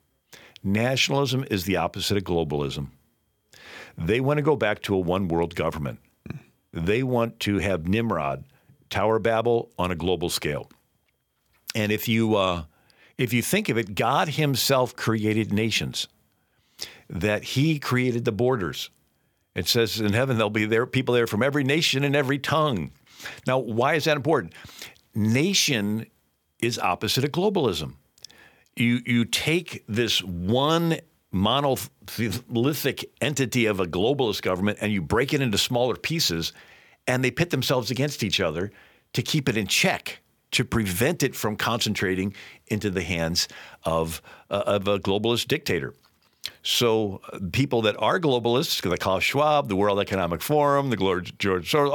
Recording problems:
abrupt cut into speech; at the end

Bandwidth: 18 kHz